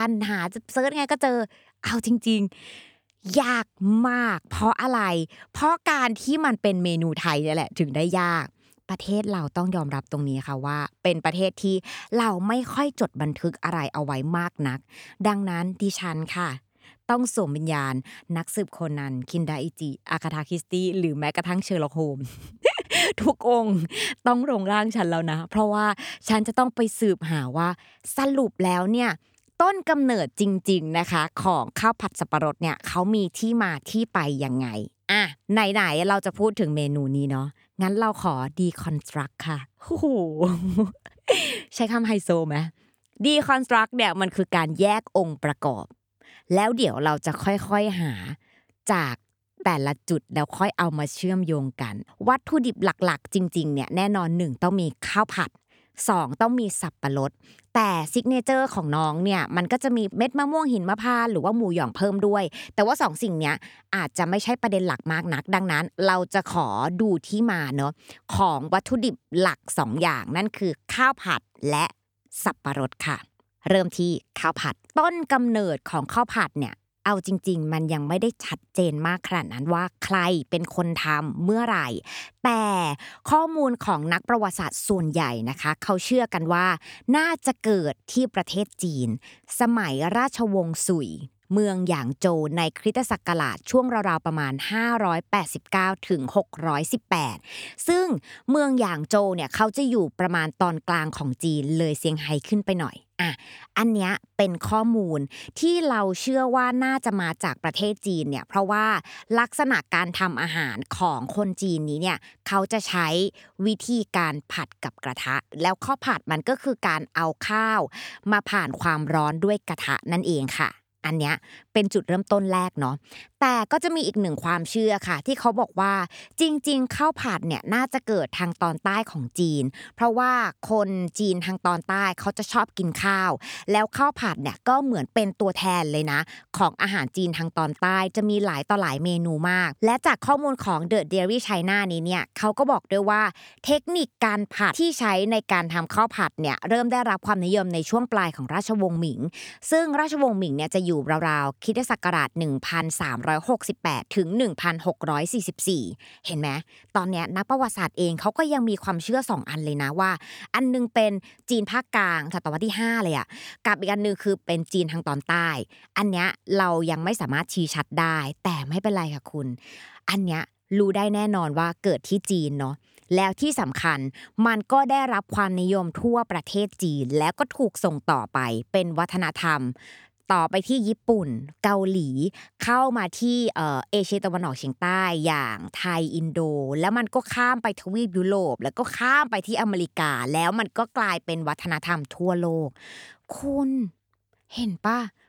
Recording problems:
abrupt cut into speech; at the start

